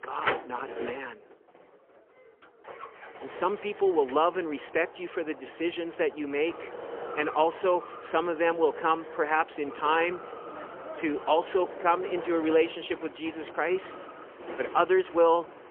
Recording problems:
phone-call audio; poor line; nothing above 3 kHz
traffic noise; noticeable; throughout; 10 dB below the speech

